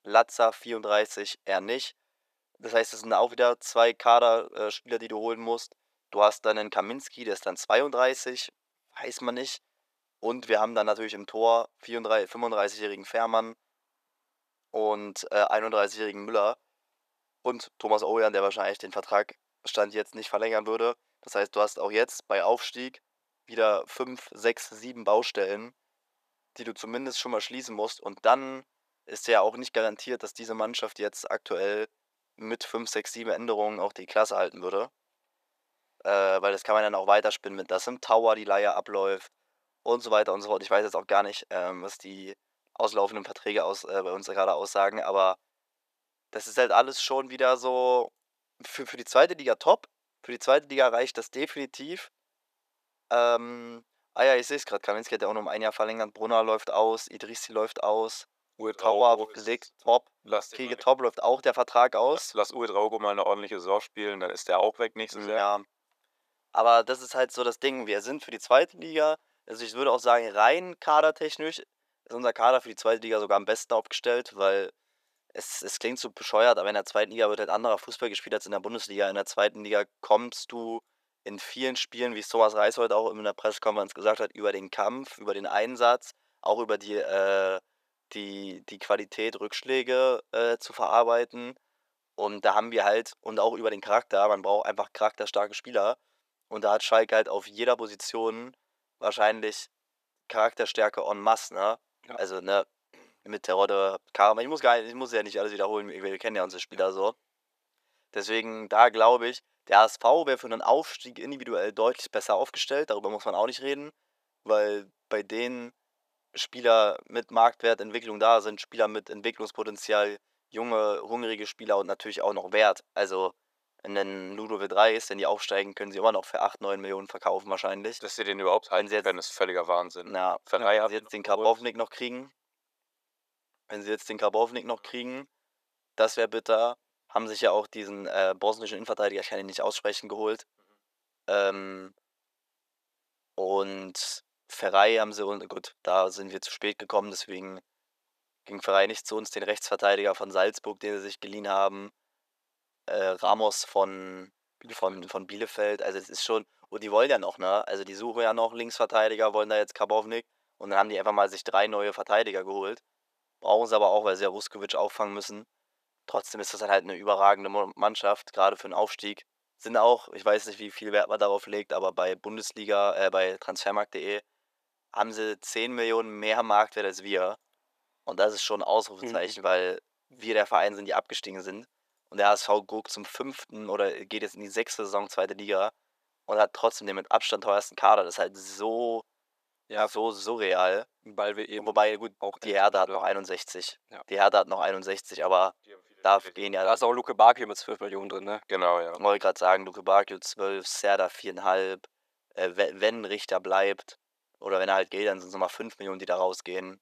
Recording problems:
thin; very; fading below 450 Hz

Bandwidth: 14.5 kHz